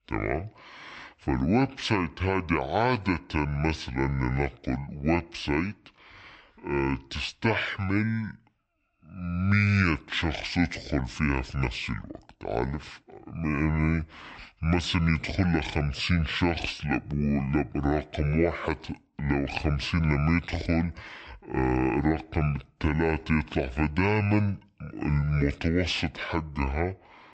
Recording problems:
wrong speed and pitch; too slow and too low; 0.6 times normal speed

